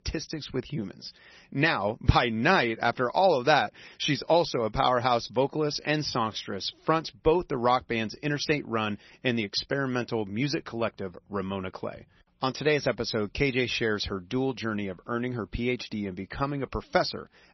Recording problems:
garbled, watery; slightly; nothing above 6 kHz

